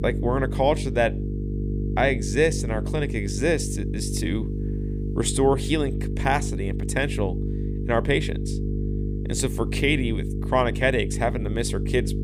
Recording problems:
electrical hum; noticeable; throughout; 50 Hz, 10 dB below the speech

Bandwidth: 15 kHz